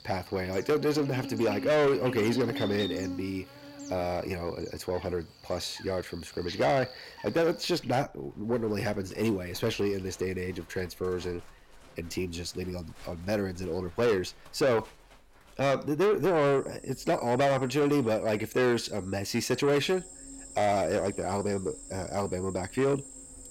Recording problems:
distortion; heavy; 8 dB below the speech
animal sounds; noticeable; throughout; 15 dB below the speech

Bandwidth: 16 kHz